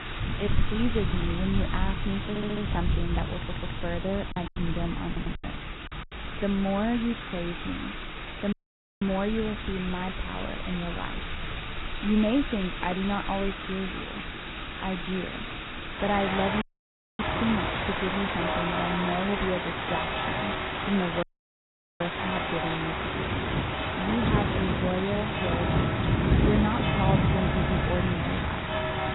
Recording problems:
garbled, watery; badly; nothing above 4 kHz
rain or running water; very loud; throughout; 1 dB above the speech
audio stuttering; 4 times, first at 2.5 s
choppy; very; from 4.5 to 5.5 s; 8% of the speech affected
audio cutting out; at 8.5 s, at 17 s for 0.5 s and at 21 s for 1 s

